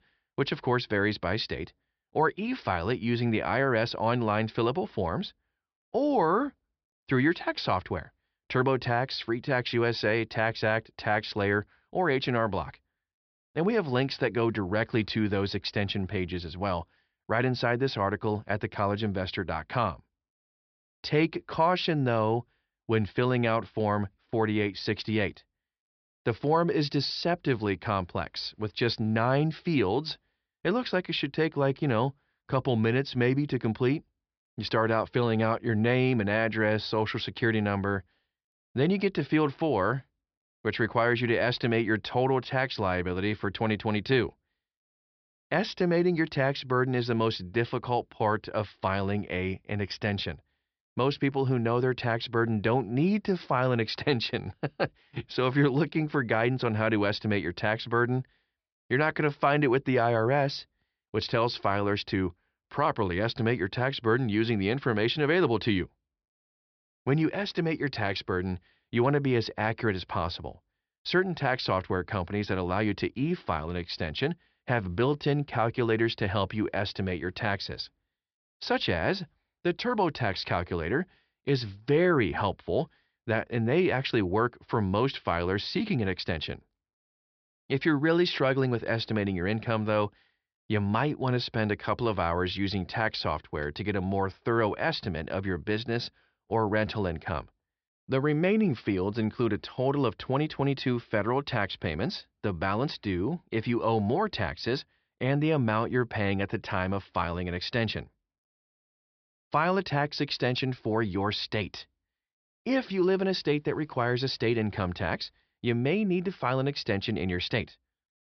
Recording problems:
high frequencies cut off; noticeable; nothing above 5.5 kHz

